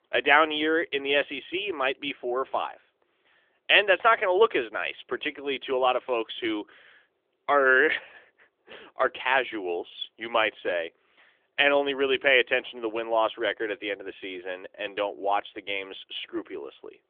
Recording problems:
phone-call audio; nothing above 3.5 kHz

